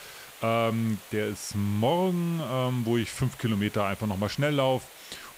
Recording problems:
hiss; noticeable; throughout; 20 dB below the speech

